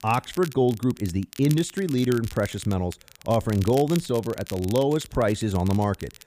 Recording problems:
crackle, like an old record; noticeable; 15 dB below the speech

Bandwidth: 15 kHz